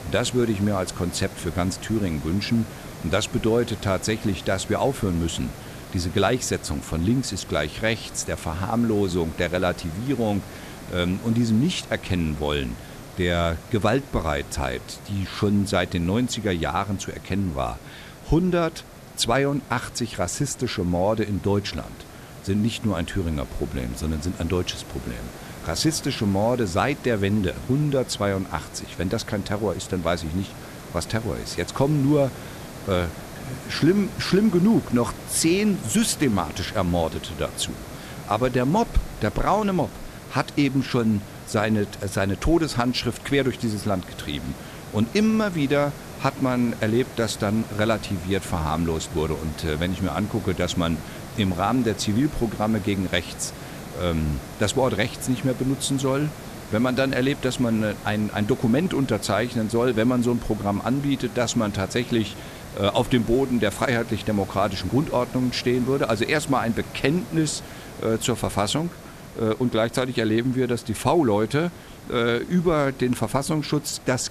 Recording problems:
hiss; noticeable; throughout; 15 dB below the speech

